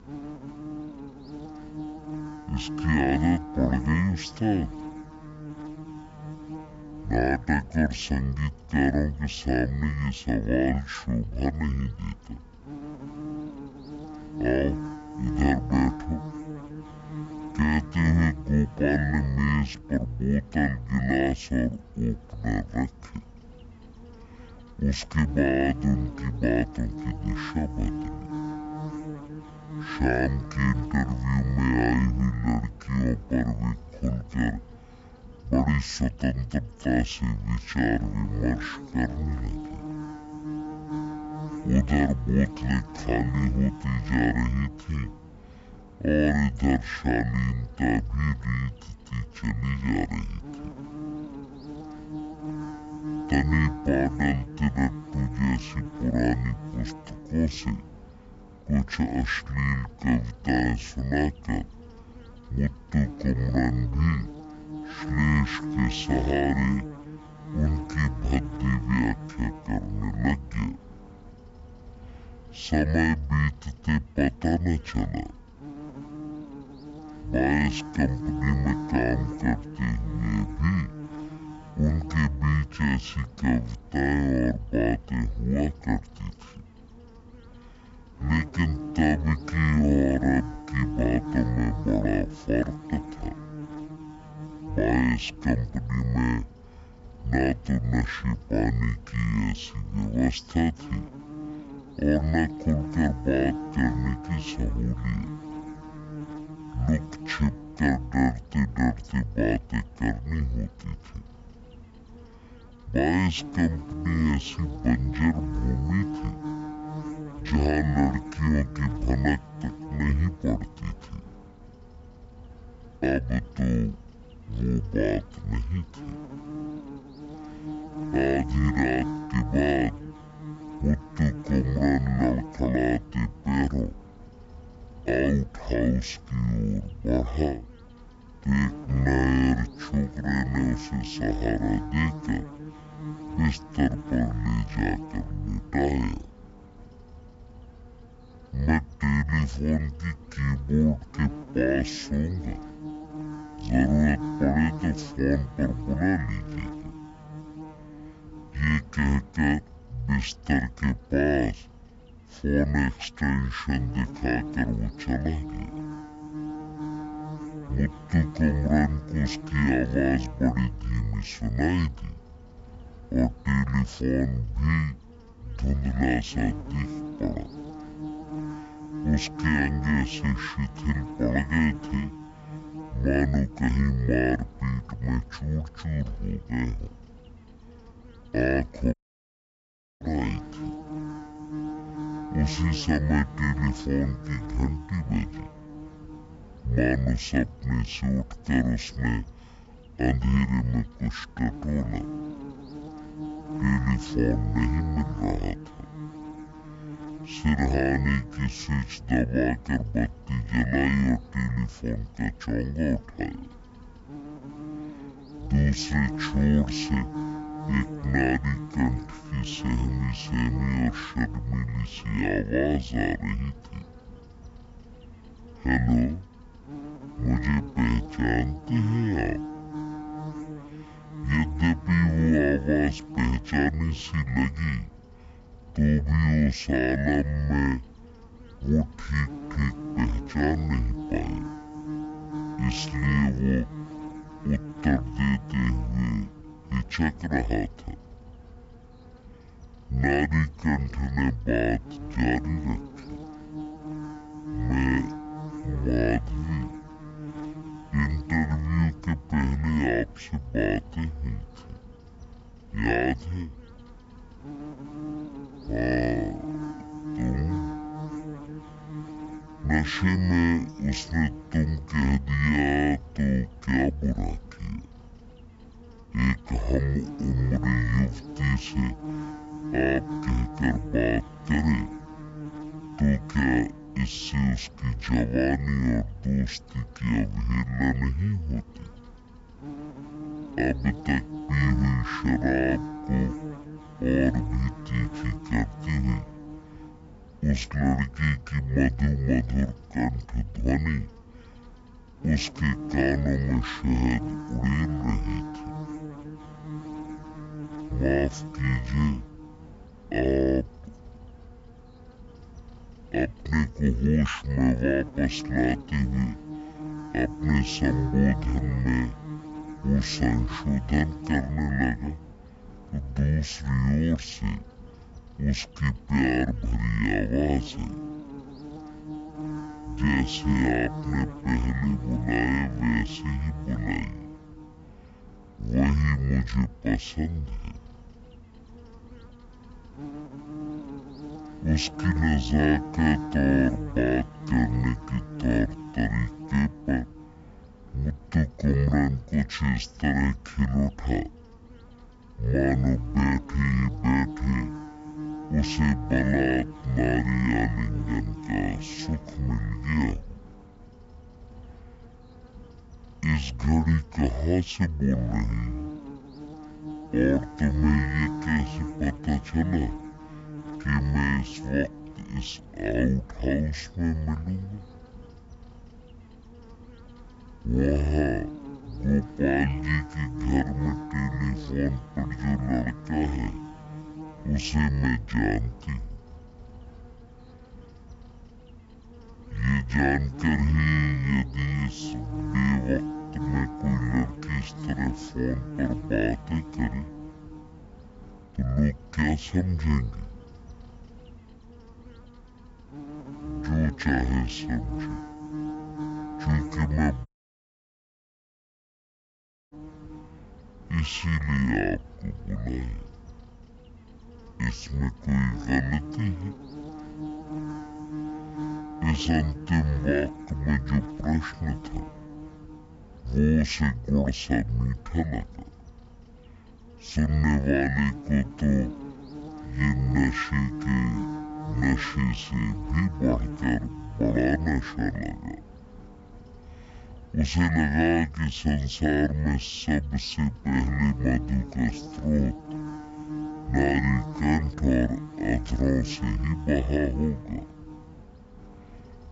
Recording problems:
wrong speed and pitch; too slow and too low; 0.5 times normal speed
electrical hum; noticeable; throughout; 60 Hz, 10 dB below the speech
audio cutting out; at 3:09 for 1 s and at 6:47 for 2.5 s

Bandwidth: 7.5 kHz